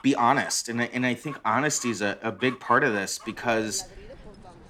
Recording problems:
animal sounds; noticeable; throughout; 20 dB below the speech

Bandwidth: 18.5 kHz